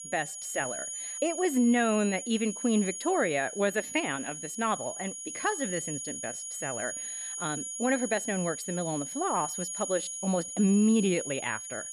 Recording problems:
high-pitched whine; loud; throughout; 6.5 kHz, 6 dB below the speech

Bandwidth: 13.5 kHz